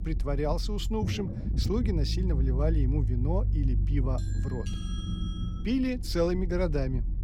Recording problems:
low rumble; noticeable; throughout; 10 dB below the speech
doorbell; faint; from 4 to 5.5 s; peak 10 dB below the speech

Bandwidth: 17 kHz